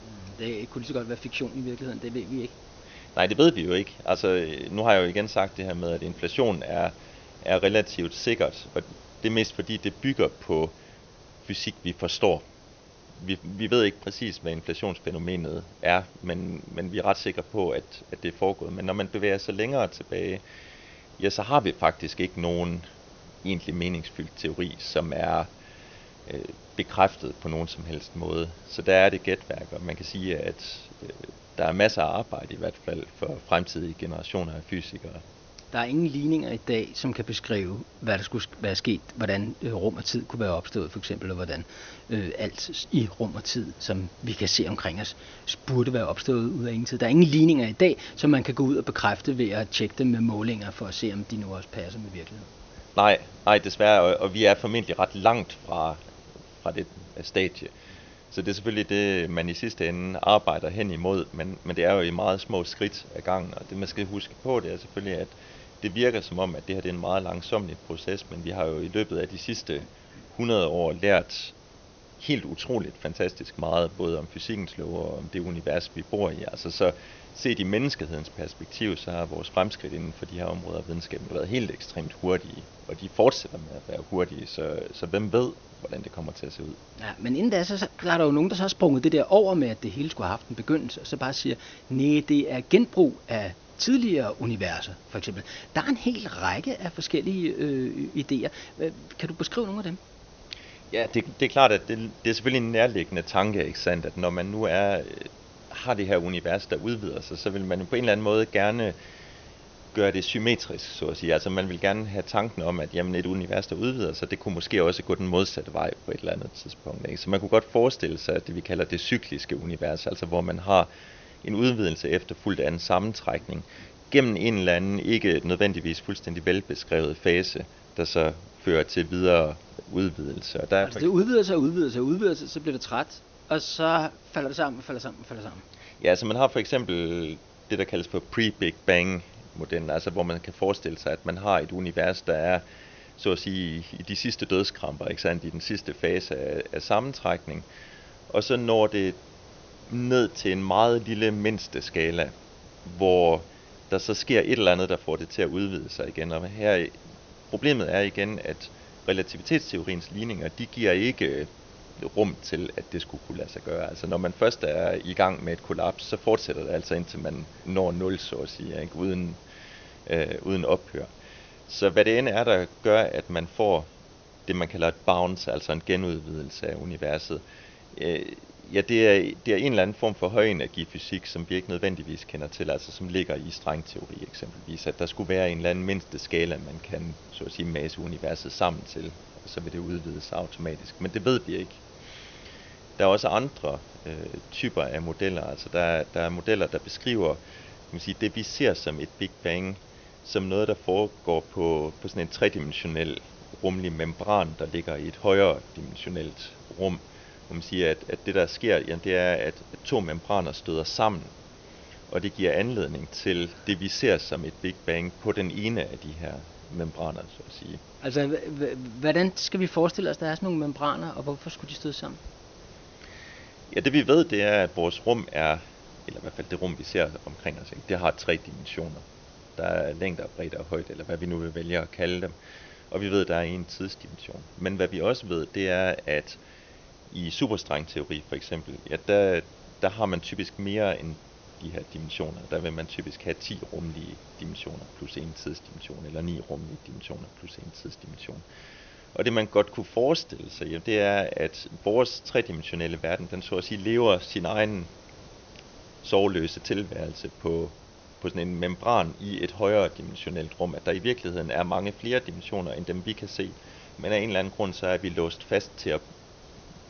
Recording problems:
high frequencies cut off; noticeable; nothing above 6.5 kHz
hiss; faint; throughout; 25 dB below the speech

